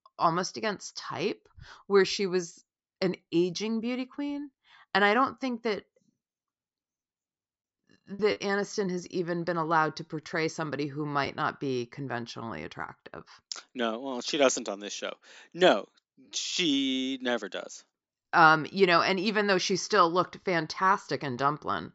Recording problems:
high frequencies cut off; noticeable; nothing above 8 kHz
choppy; occasionally; from 8 to 11 s; 1% of the speech affected

